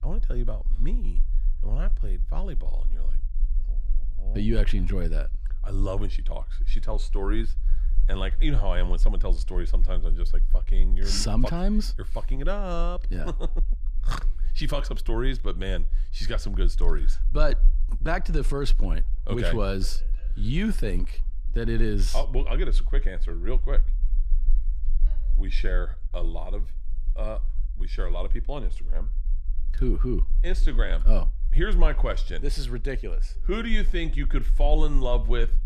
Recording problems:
low rumble; faint; throughout; 25 dB below the speech

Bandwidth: 14.5 kHz